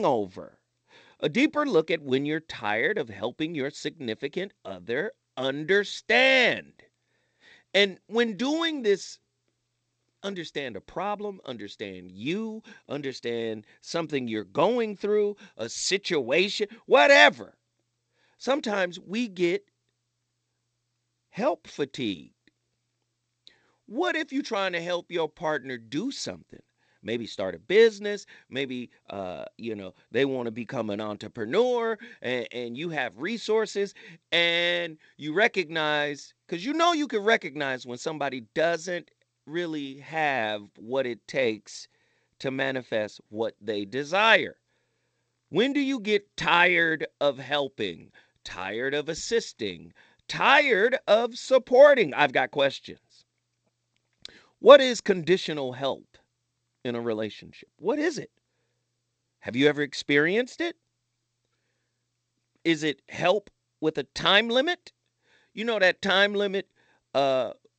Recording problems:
garbled, watery; slightly; nothing above 8 kHz
abrupt cut into speech; at the start

